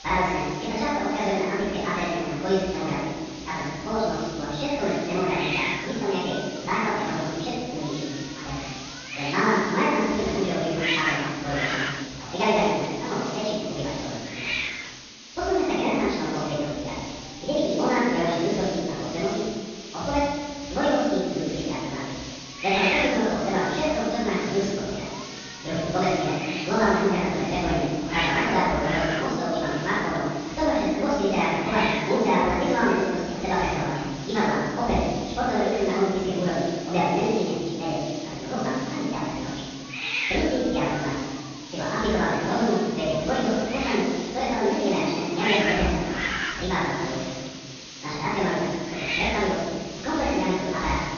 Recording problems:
room echo; strong; dies away in 1.5 s
off-mic speech; far
wrong speed and pitch; too fast and too high; 1.6 times normal speed
high frequencies cut off; noticeable; nothing above 6.5 kHz
hiss; loud; throughout; 8 dB below the speech

